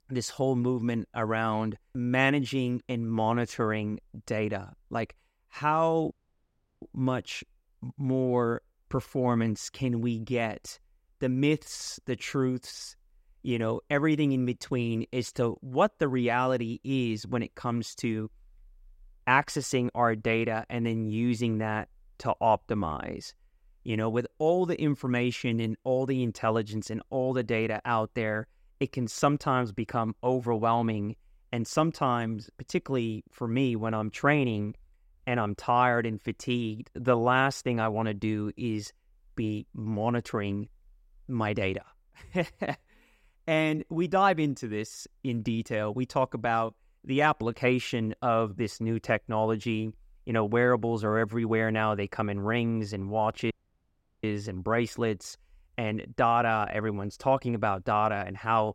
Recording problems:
audio cutting out; at 6 s for 0.5 s and at 54 s for 0.5 s

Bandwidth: 16 kHz